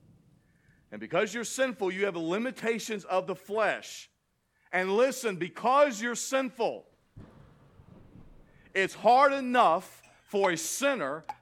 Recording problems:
rain or running water; faint; throughout; 20 dB below the speech

